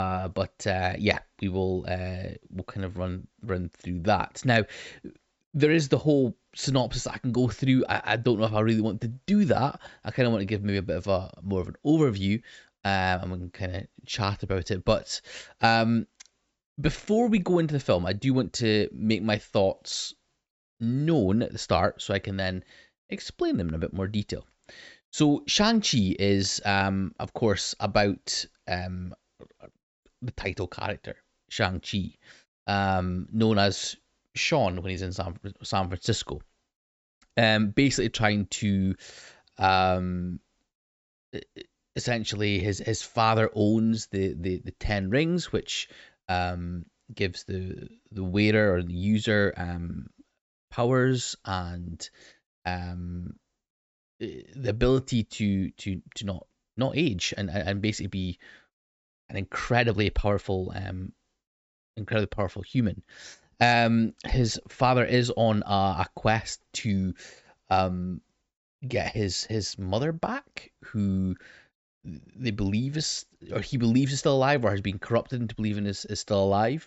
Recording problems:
high frequencies cut off; noticeable; nothing above 7.5 kHz
abrupt cut into speech; at the start

